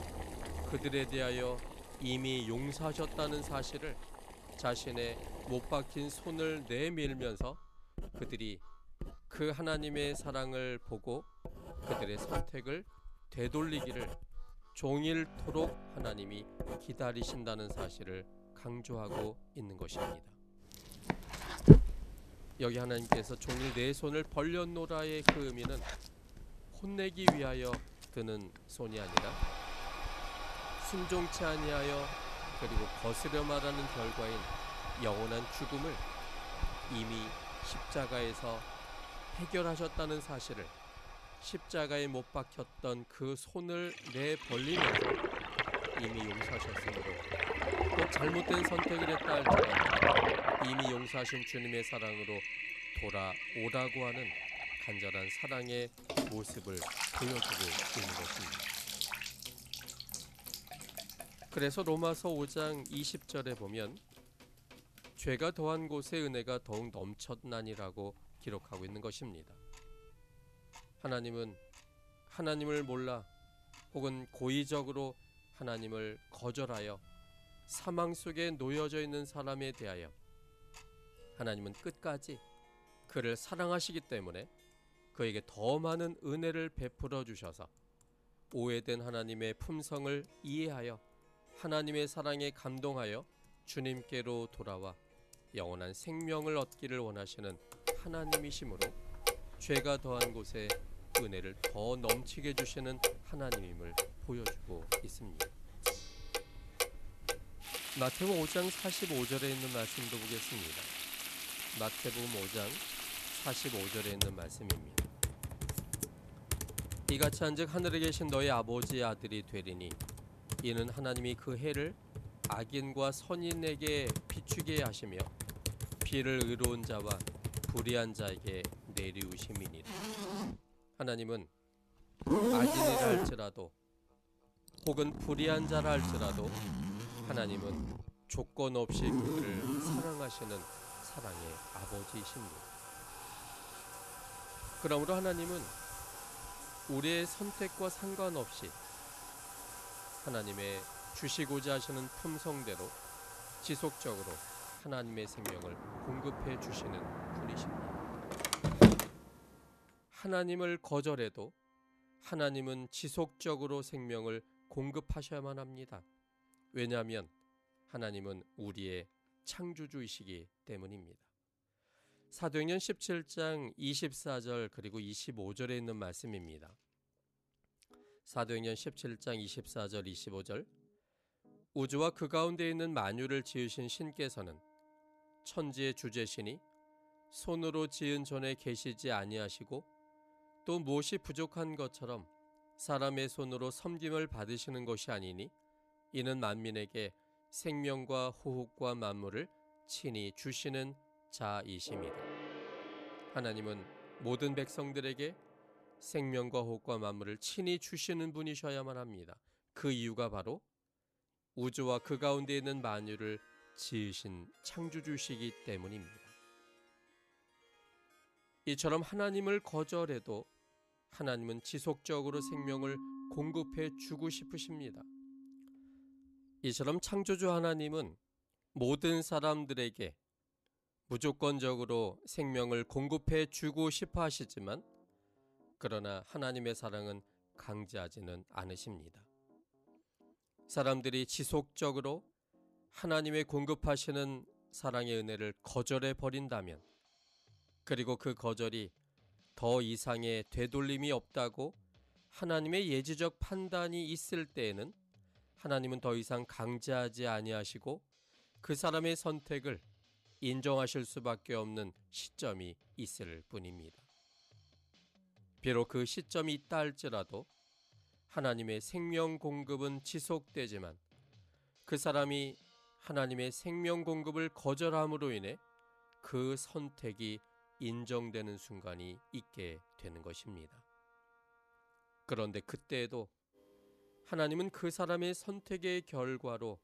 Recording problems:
household noises; very loud; until 2:40; 2 dB above the speech
background music; faint; throughout; 20 dB below the speech

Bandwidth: 14 kHz